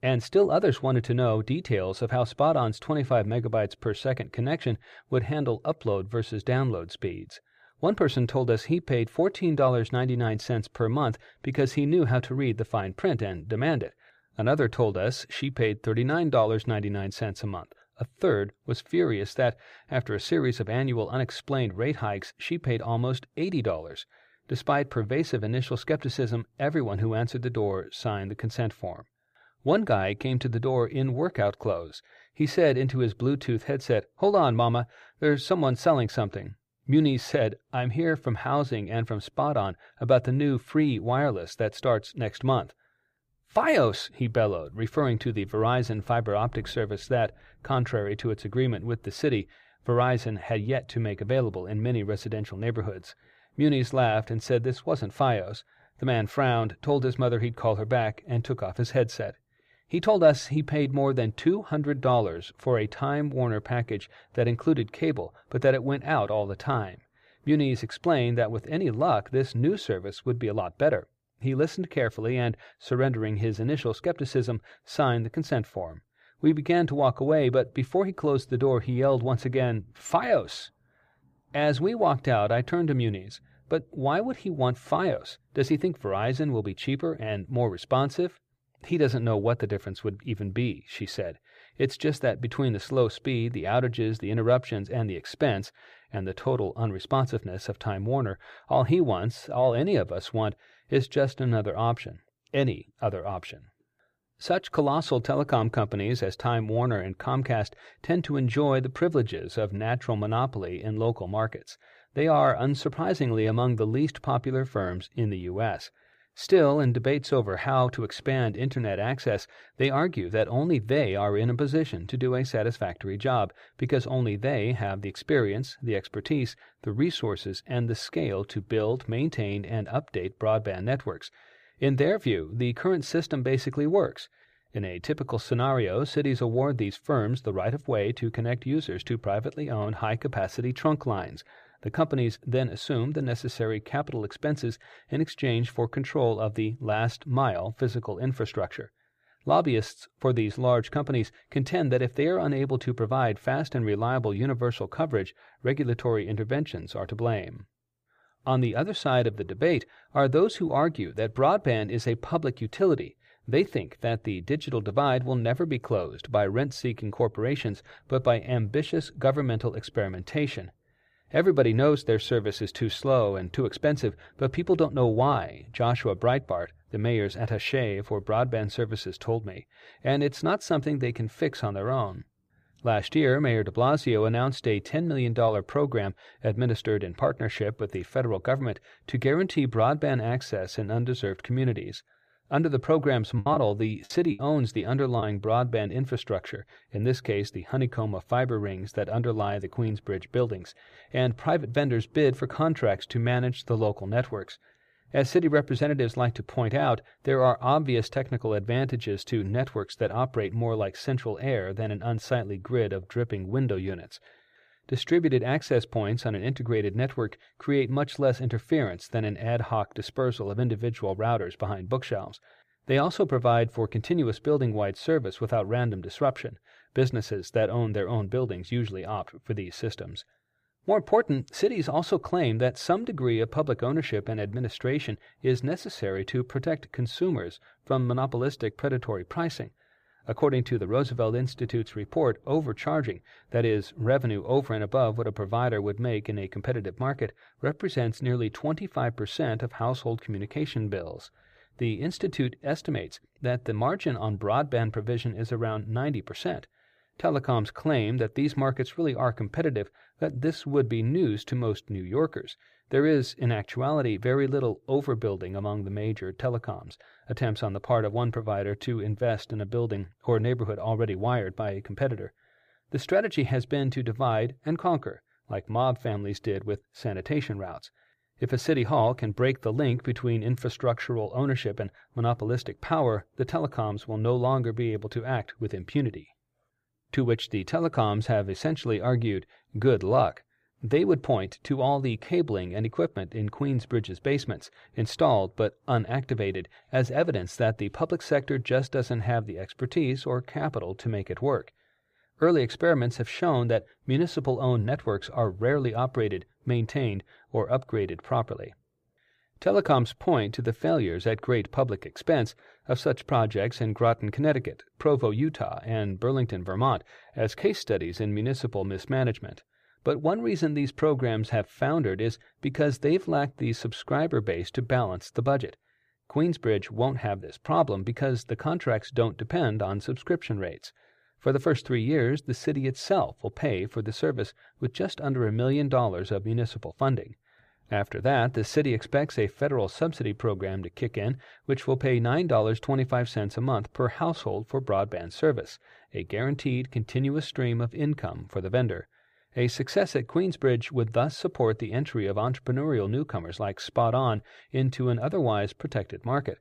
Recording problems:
choppy; very; from 3:13 to 3:15; 12% of the speech affected

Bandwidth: 15 kHz